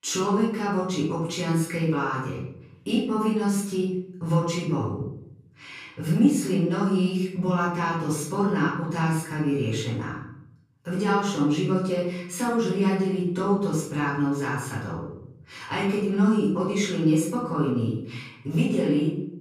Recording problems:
off-mic speech; far
room echo; noticeable; dies away in 0.8 s

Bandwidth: 15 kHz